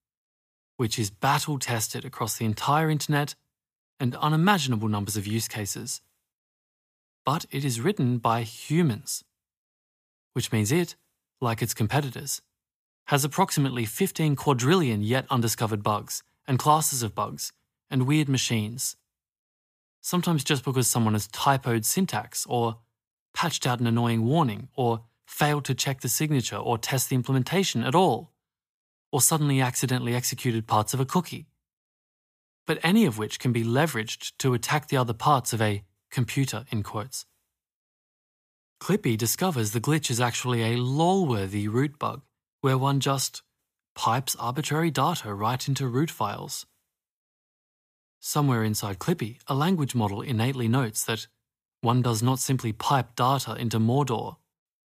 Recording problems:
none

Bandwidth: 15 kHz